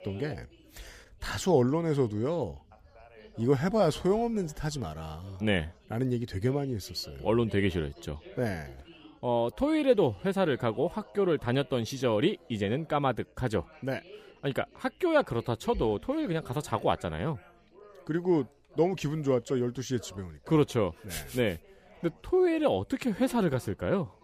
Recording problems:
background chatter; faint; throughout; 3 voices, 25 dB below the speech

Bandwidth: 15 kHz